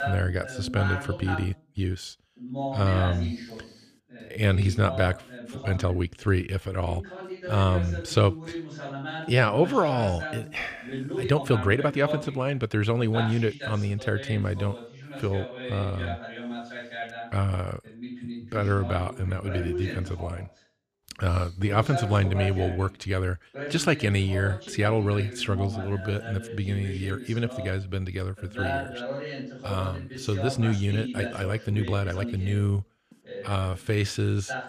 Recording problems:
voice in the background; loud; throughout; 9 dB below the speech
uneven, jittery; strongly; from 1 to 34 s

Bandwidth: 14.5 kHz